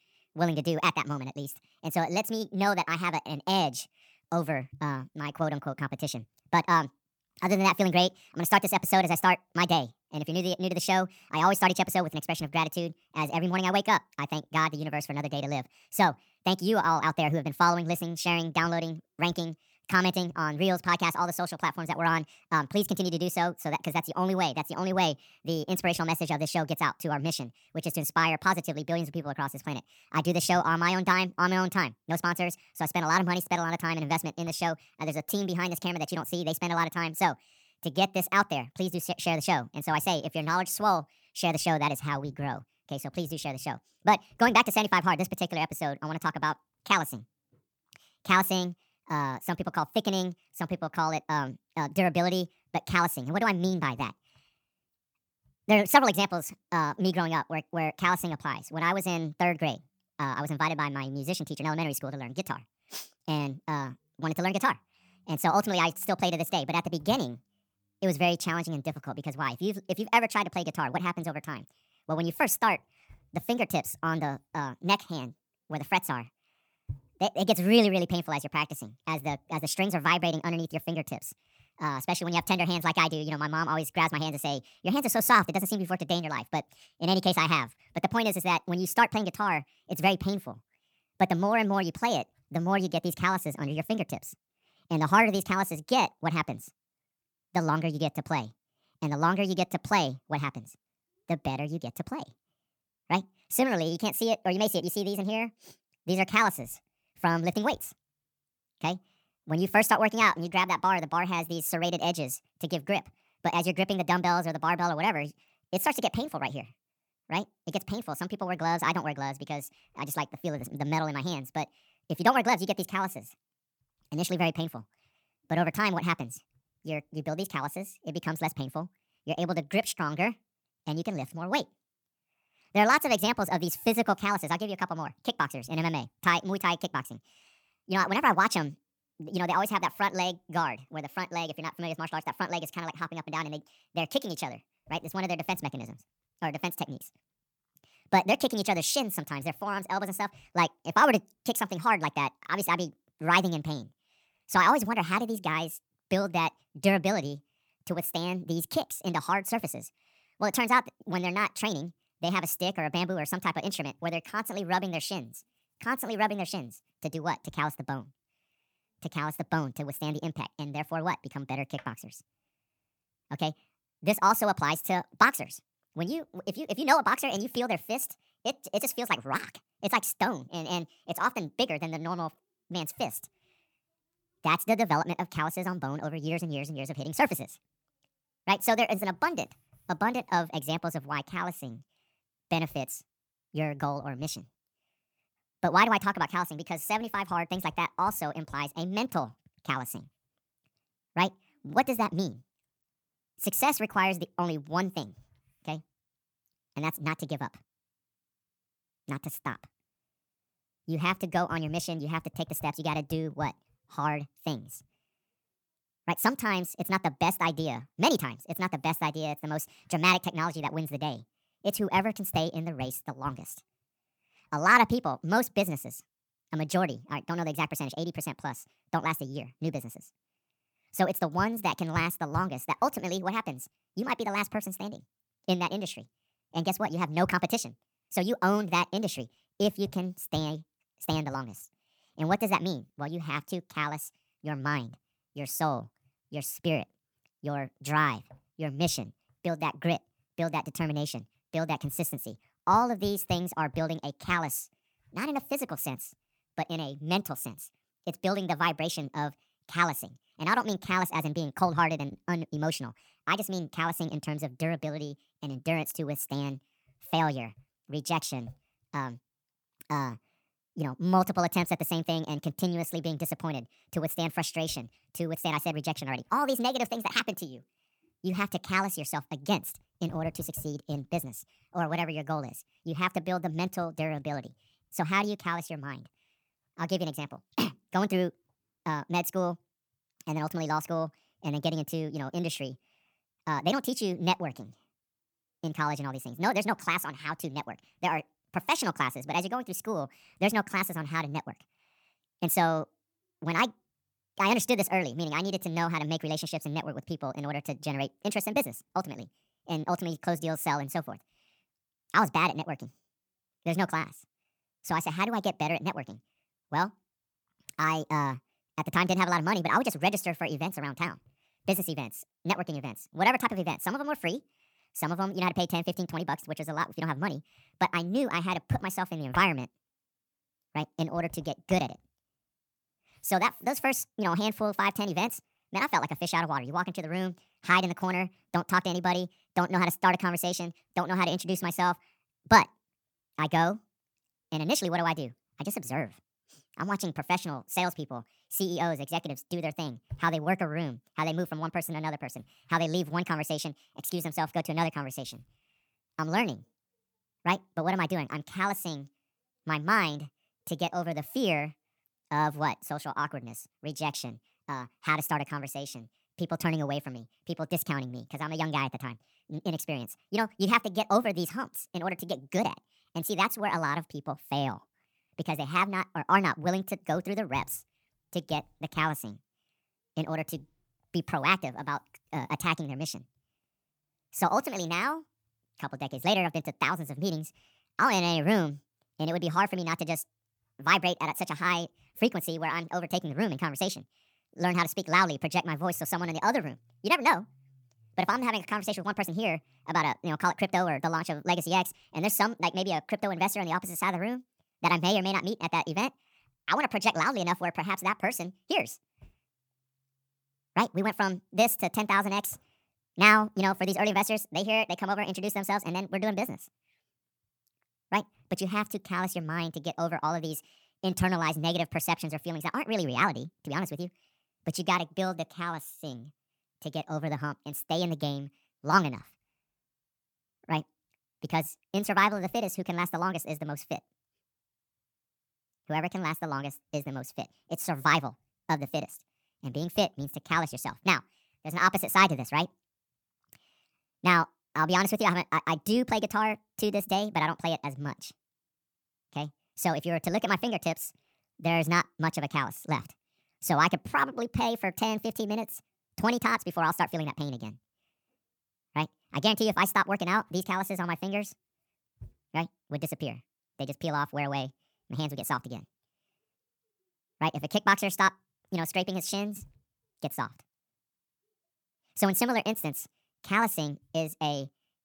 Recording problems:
wrong speed and pitch; too fast and too high; 1.5 times normal speed

